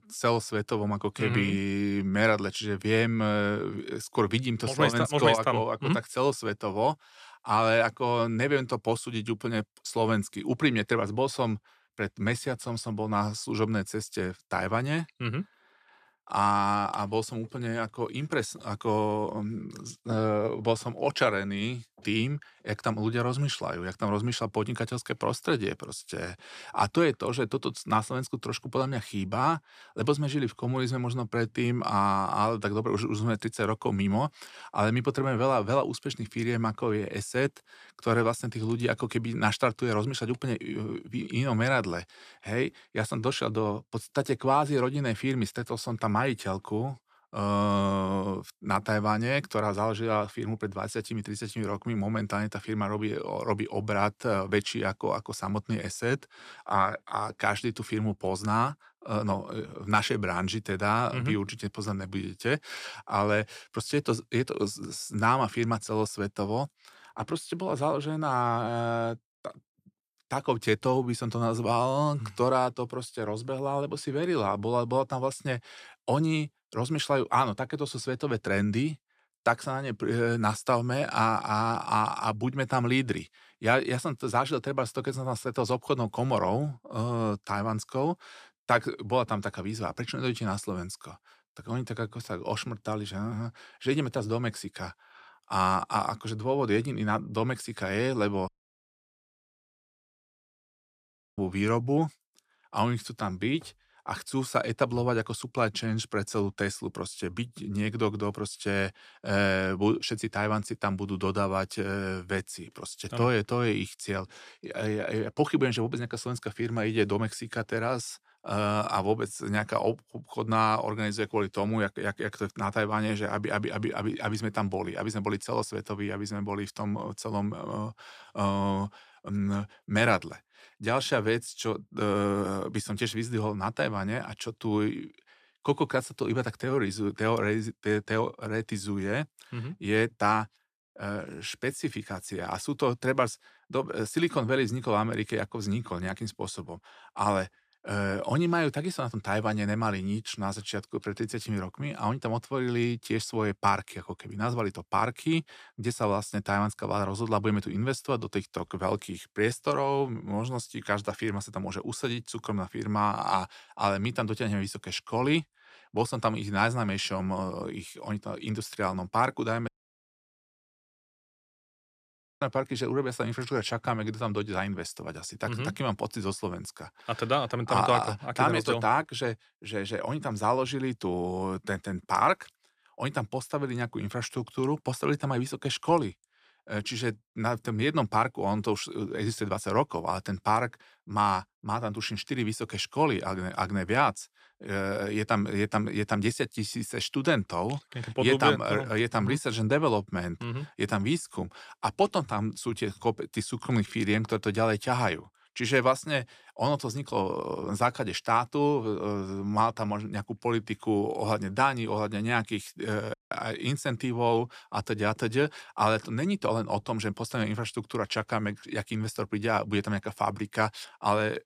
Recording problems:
audio cutting out; at 1:38 for 3 s, at 2:50 for 2.5 s and at 3:33

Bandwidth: 14.5 kHz